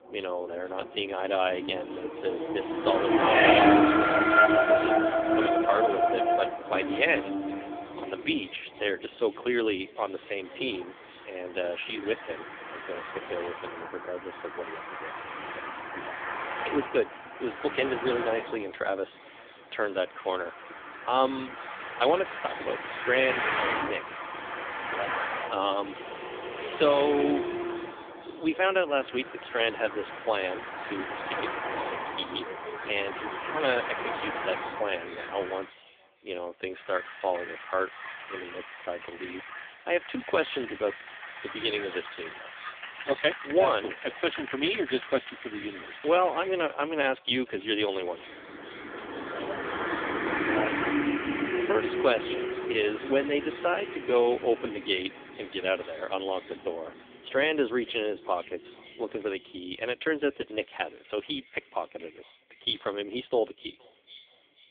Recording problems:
phone-call audio; poor line; nothing above 3.5 kHz
echo of what is said; faint; throughout; 470 ms later, 25 dB below the speech
traffic noise; loud; throughout; as loud as the speech

